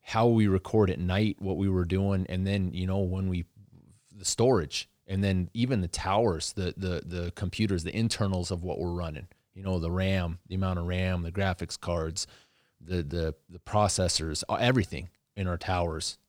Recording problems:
none

